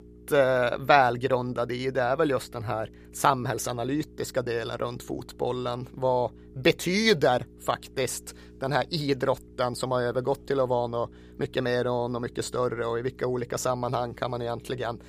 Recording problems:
electrical hum; faint; throughout; 60 Hz, 30 dB below the speech

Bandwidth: 15 kHz